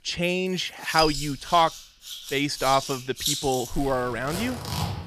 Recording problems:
household noises; loud; throughout; 6 dB below the speech

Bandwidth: 14.5 kHz